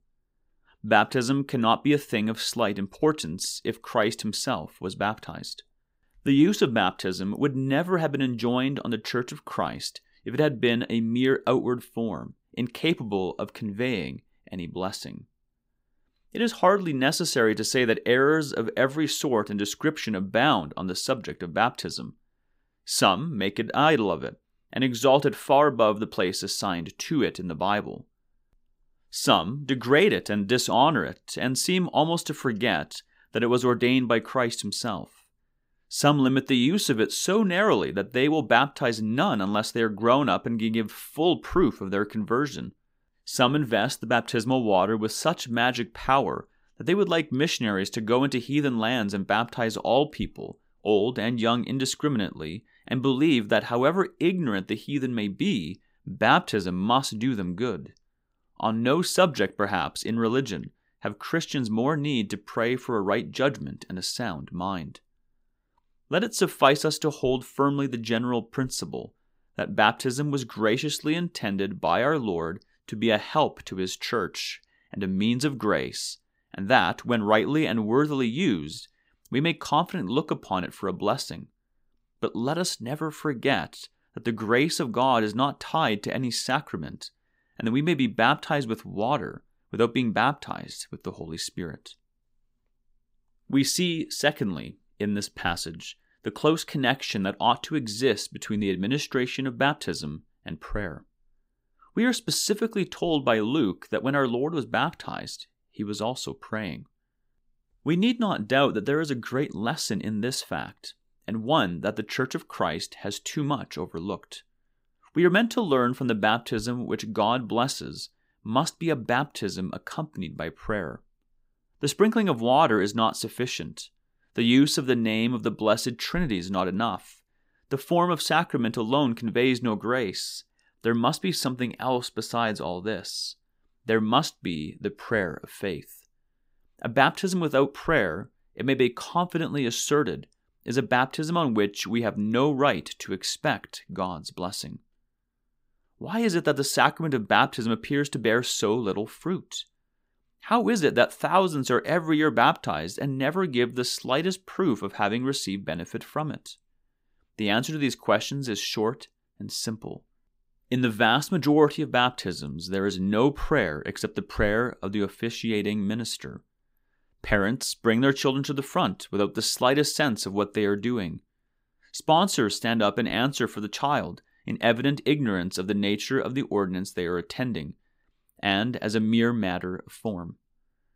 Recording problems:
none

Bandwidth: 15.5 kHz